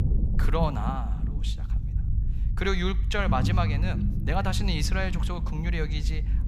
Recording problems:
low rumble; noticeable; throughout; 10 dB below the speech

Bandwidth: 15 kHz